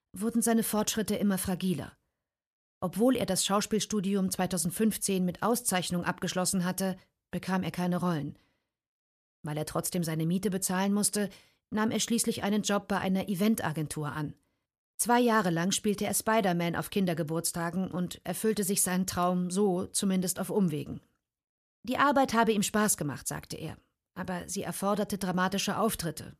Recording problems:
none

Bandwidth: 14.5 kHz